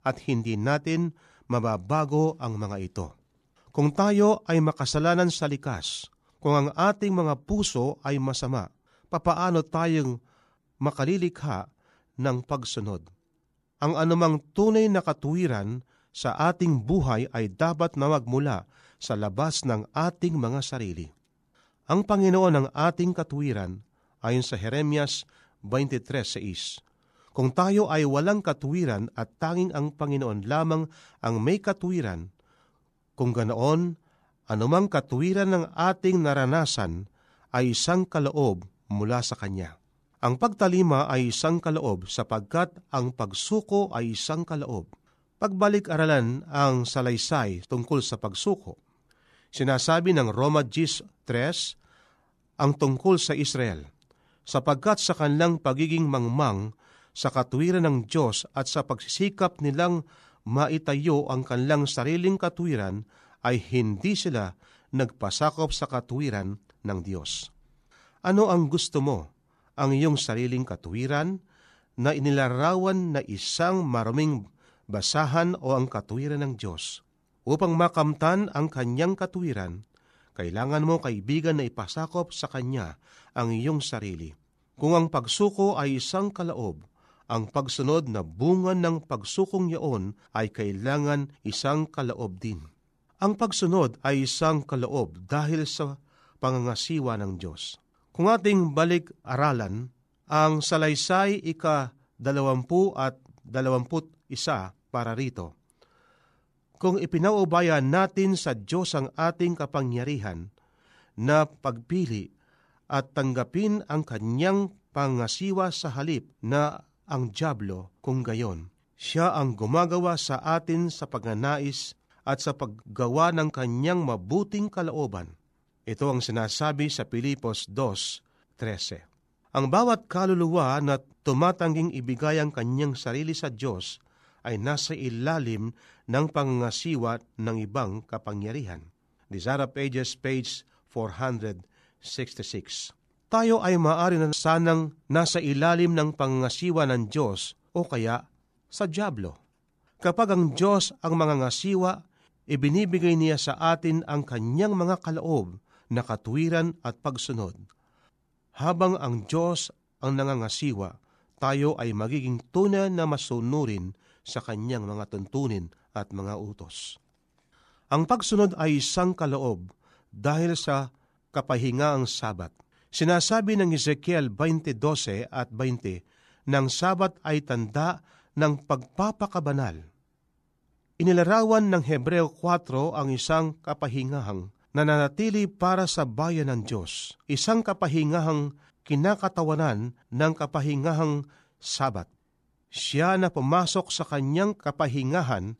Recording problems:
none

